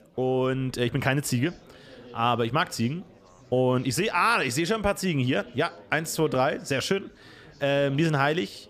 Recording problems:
chatter from many people; faint; throughout; 25 dB below the speech

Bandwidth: 15 kHz